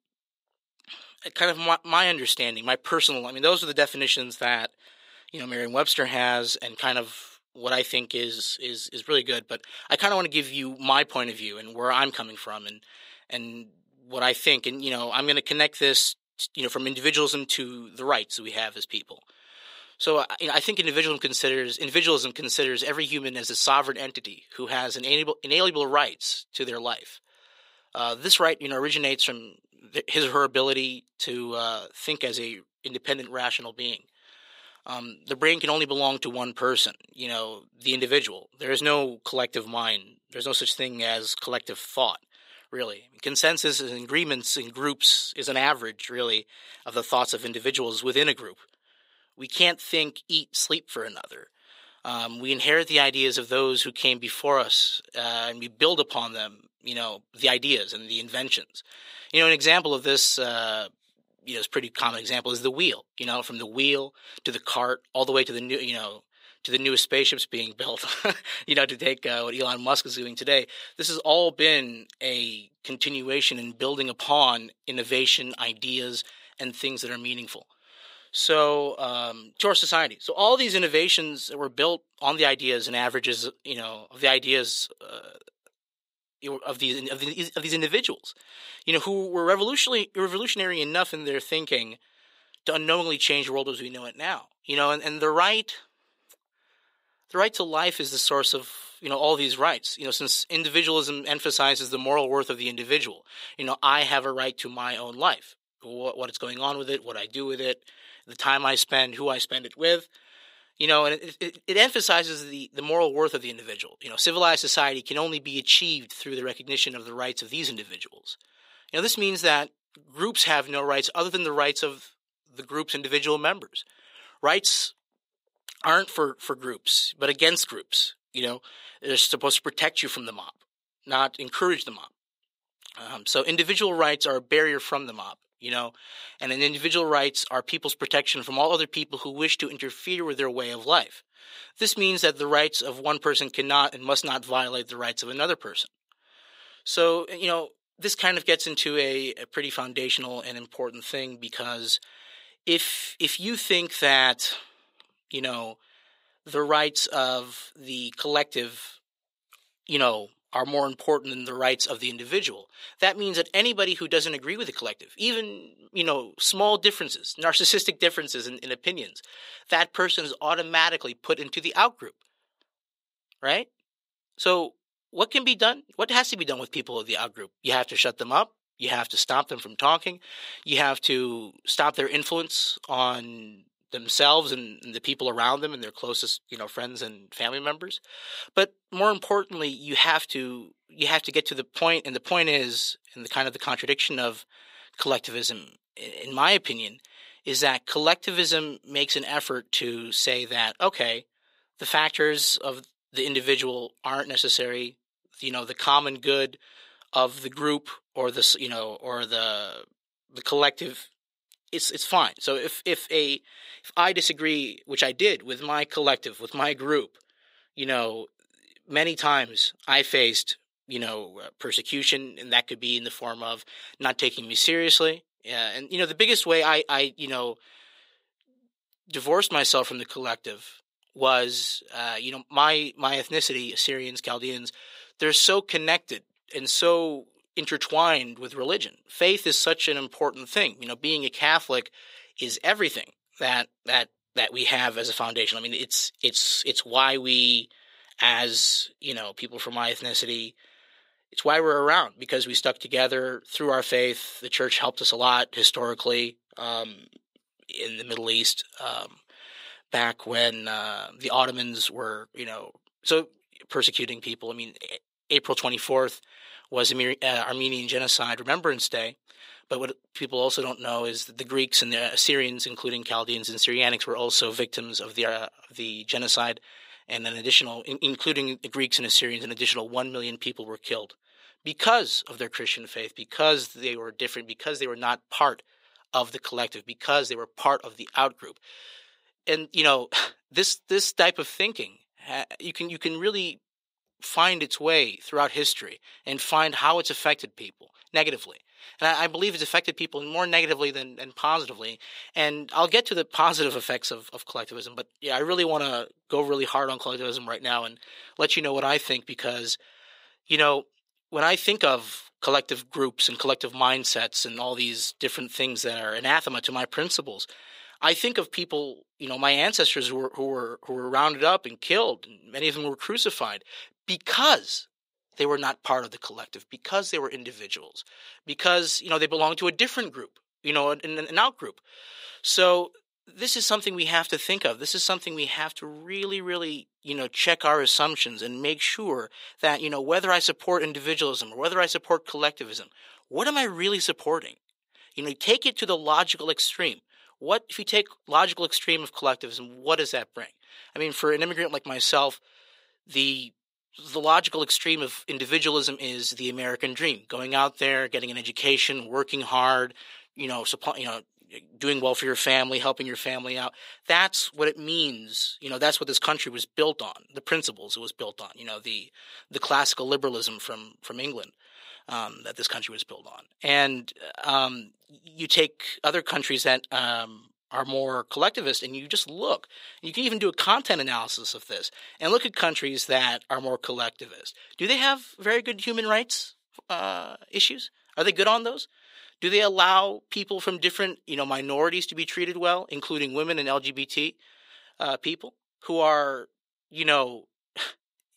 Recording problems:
thin; somewhat; fading below 500 Hz

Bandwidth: 15.5 kHz